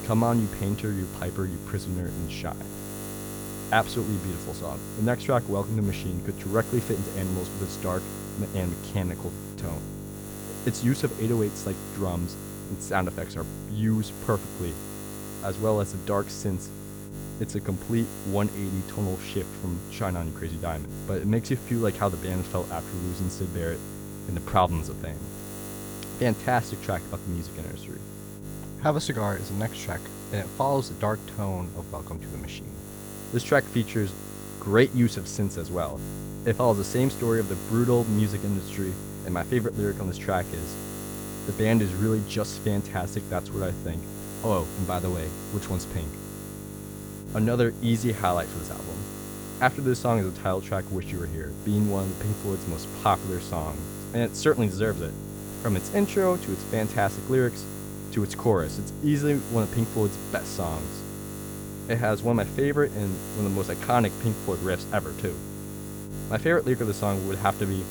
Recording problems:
electrical hum; noticeable; throughout; 50 Hz, 10 dB below the speech

